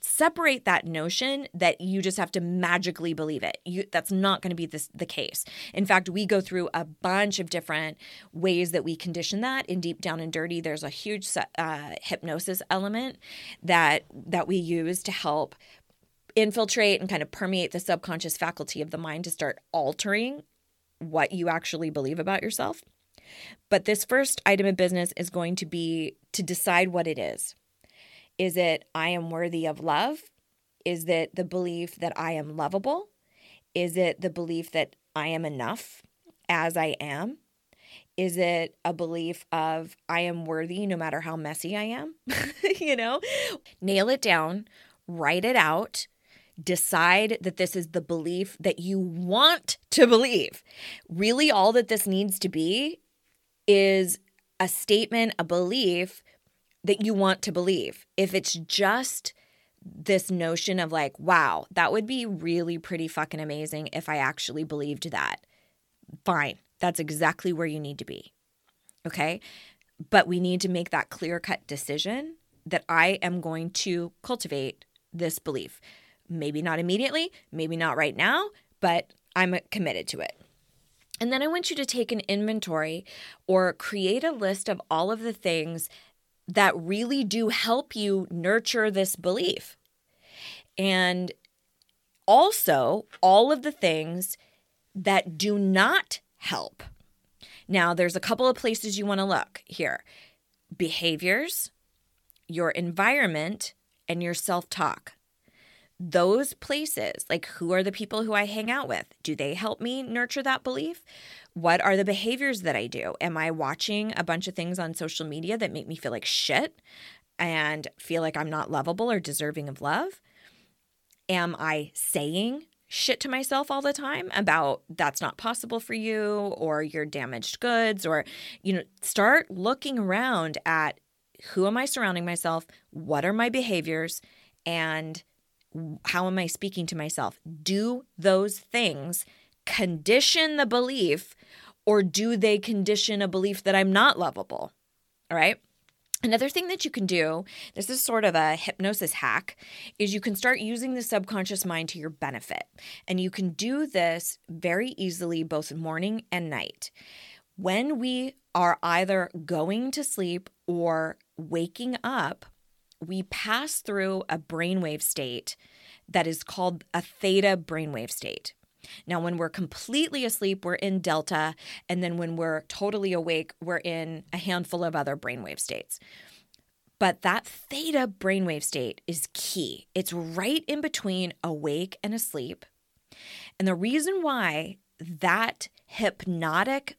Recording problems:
none

